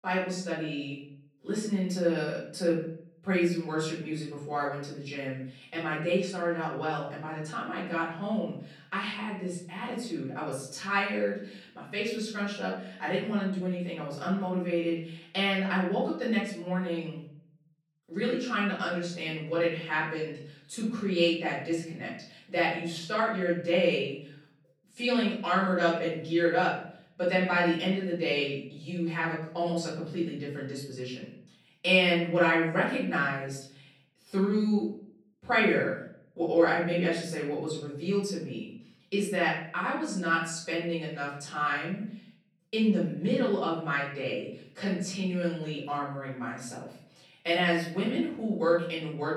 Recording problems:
off-mic speech; far
room echo; noticeable; dies away in 0.6 s

